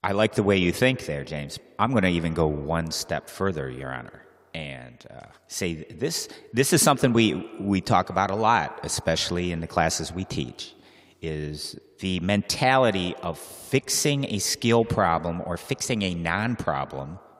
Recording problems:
echo of what is said; faint; throughout; 120 ms later, 20 dB below the speech

